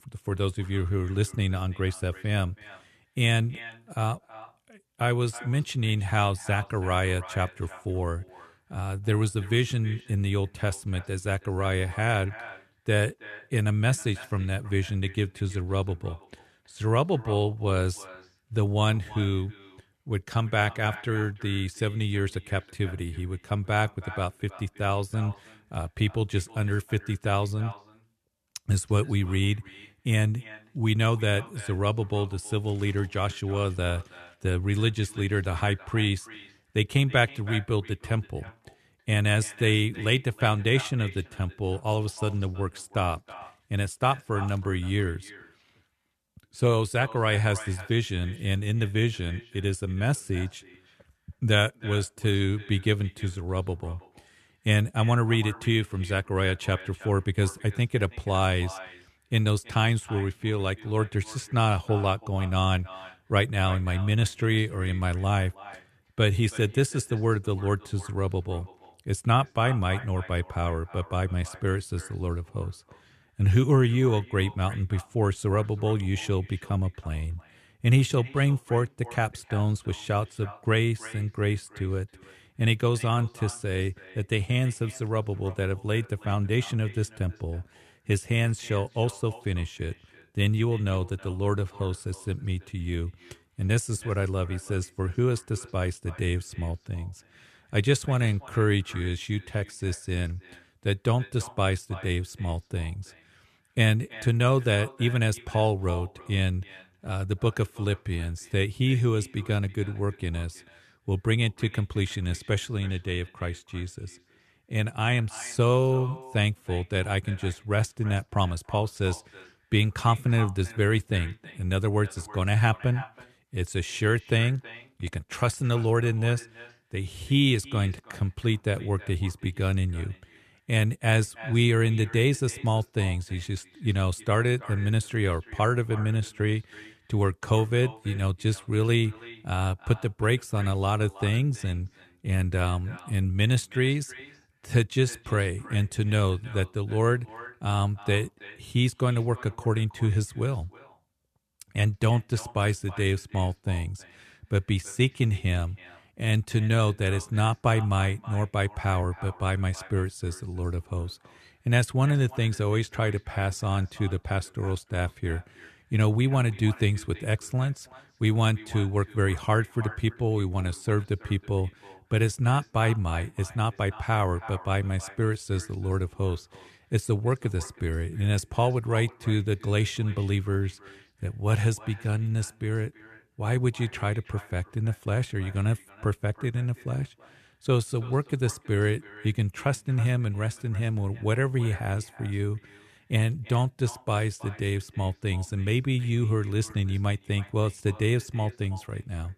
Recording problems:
echo of what is said; faint; throughout; 320 ms later, 20 dB below the speech

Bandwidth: 13.5 kHz